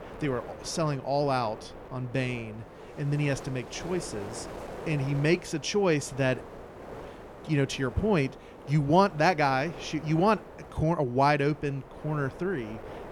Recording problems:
wind noise on the microphone; occasional gusts; 15 dB below the speech

